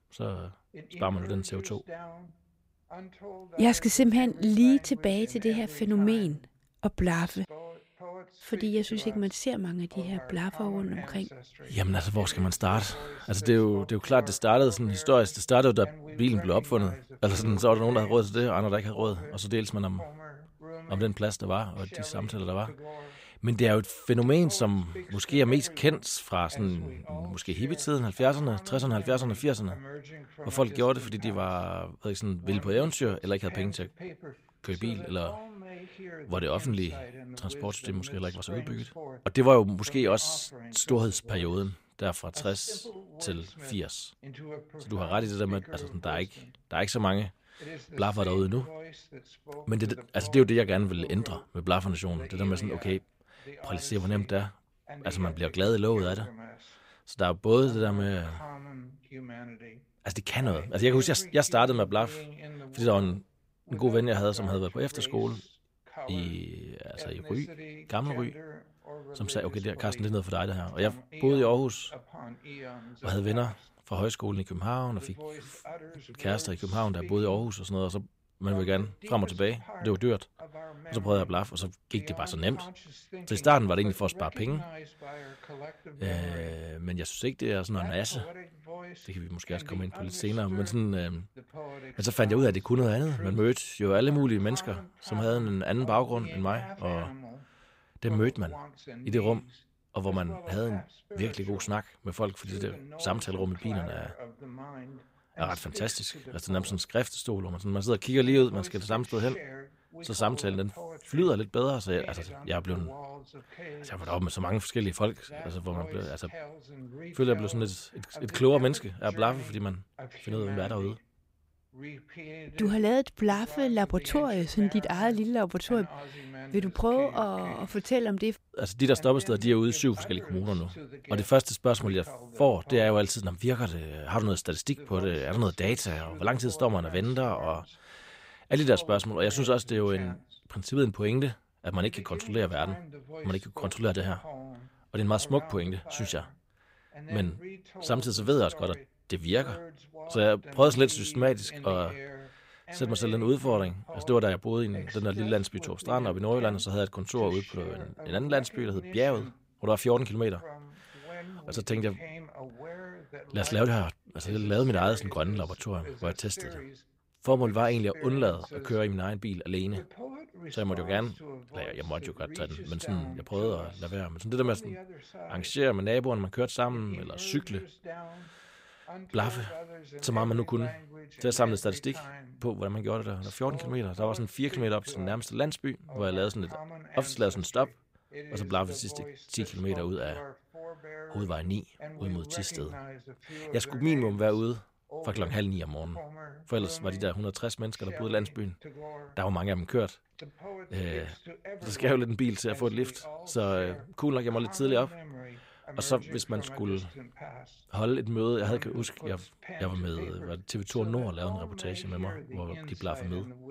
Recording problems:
voice in the background; noticeable; throughout; 15 dB below the speech

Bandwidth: 15.5 kHz